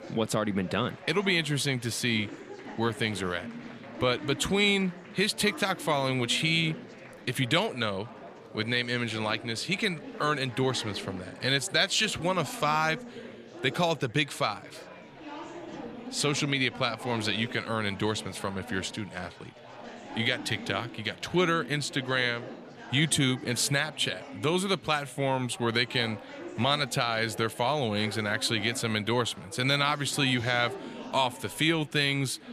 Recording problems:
chatter from many people; noticeable; throughout; 15 dB below the speech

